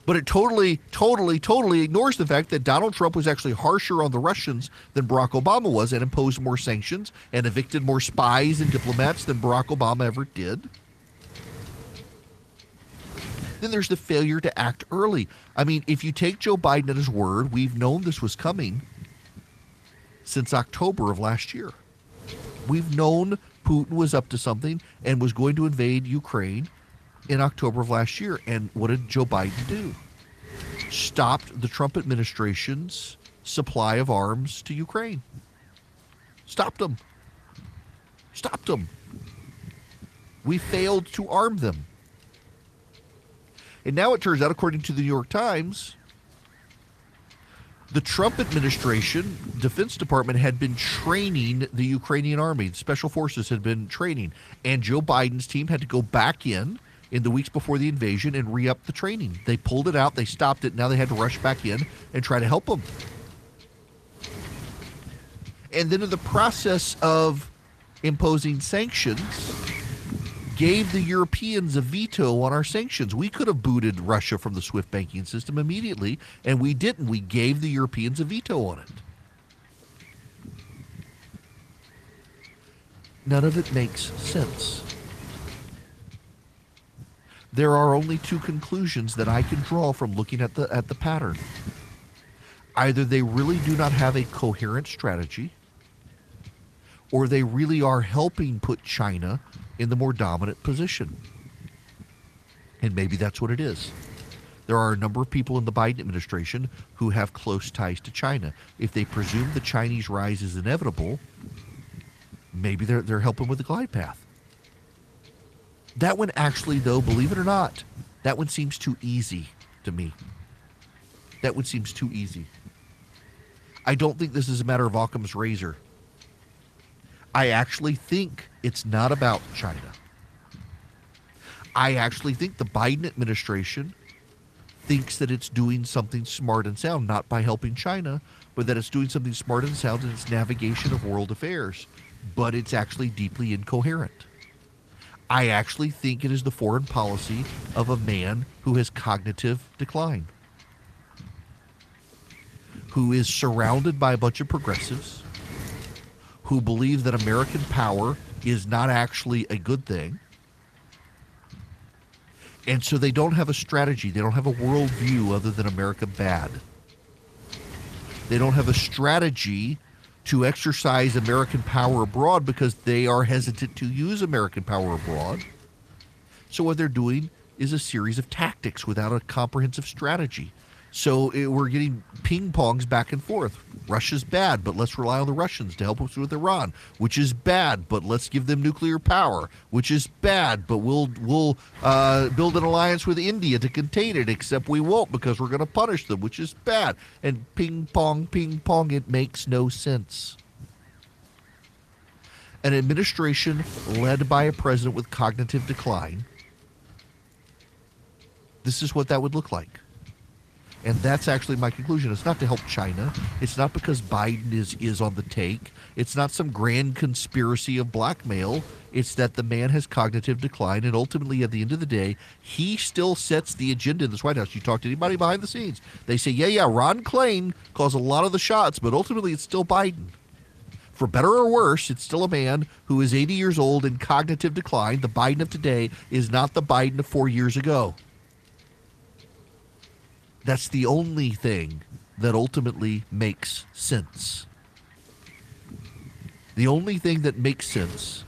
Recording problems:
garbled, watery; slightly; nothing above 14.5 kHz
wind noise on the microphone; occasional gusts; 20 dB below the speech

